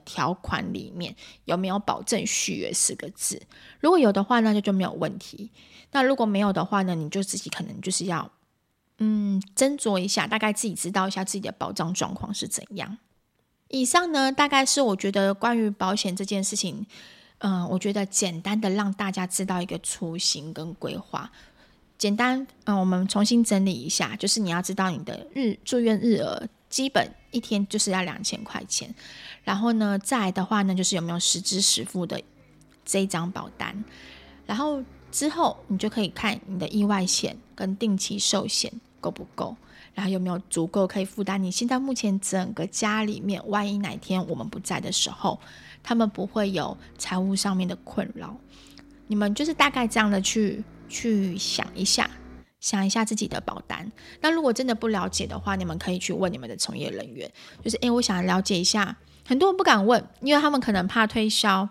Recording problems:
traffic noise; faint; throughout; 25 dB below the speech

